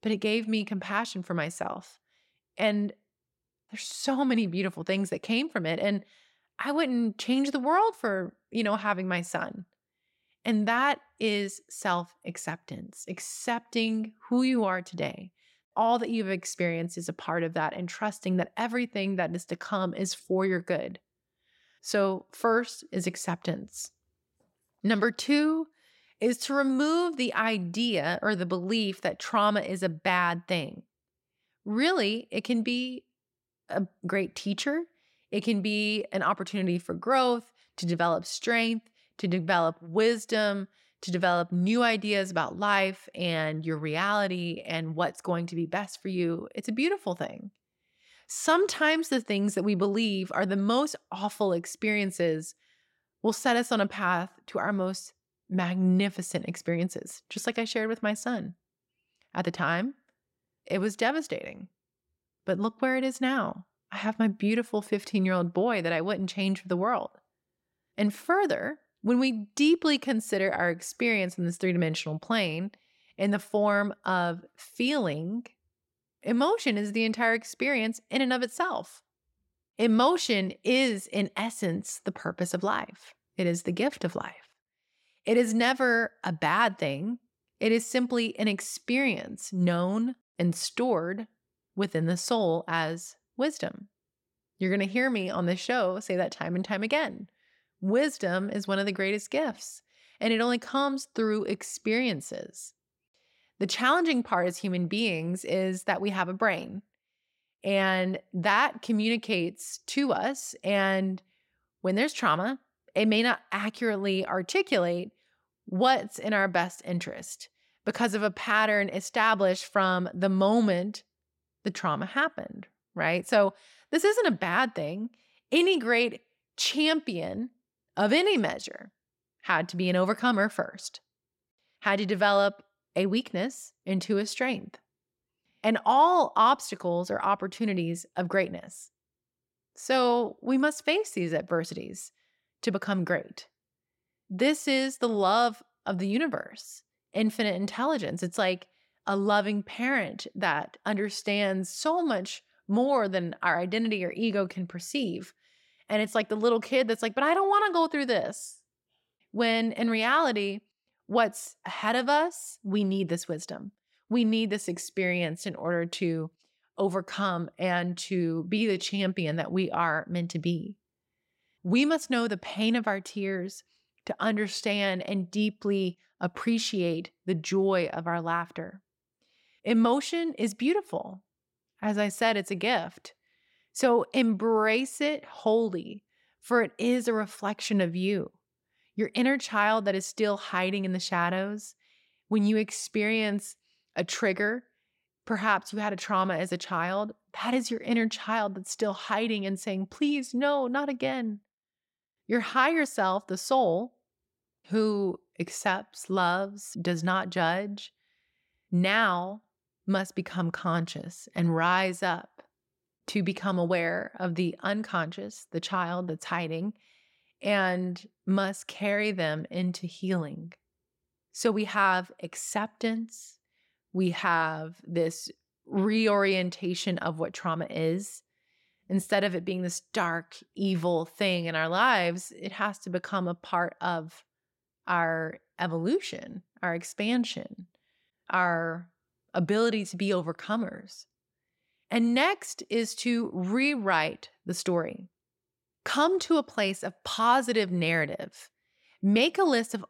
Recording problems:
none

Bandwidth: 16.5 kHz